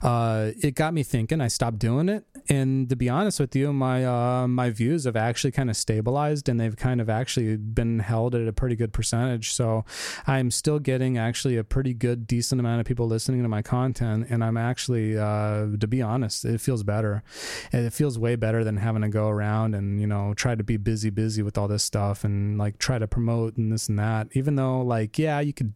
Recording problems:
squashed, flat; somewhat

